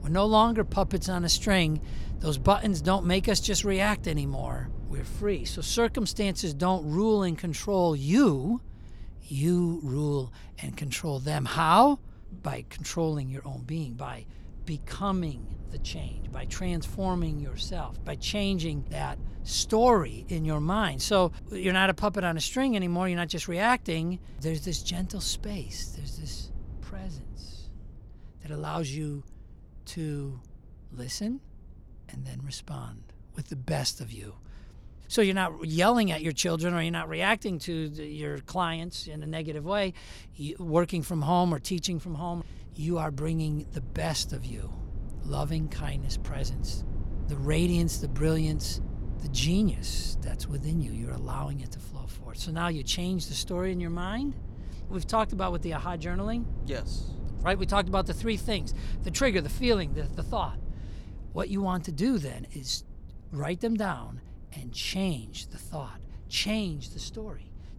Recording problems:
low rumble; faint; throughout; 25 dB below the speech

